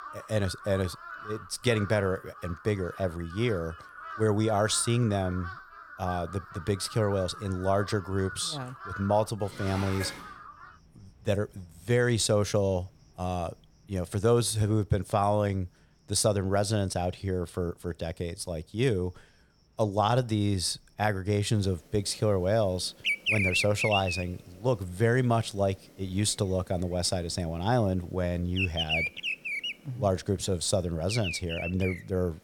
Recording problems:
animal sounds; loud; throughout; 6 dB below the speech
clattering dishes; noticeable; at 9.5 s; peak 8 dB below the speech

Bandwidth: 18 kHz